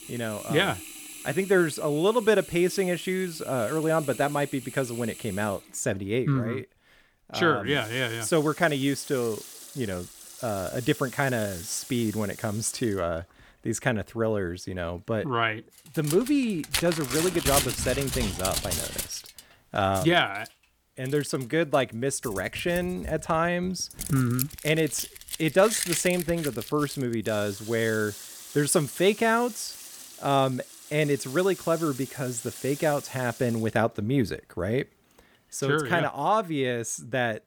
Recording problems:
household noises; loud; throughout; 9 dB below the speech

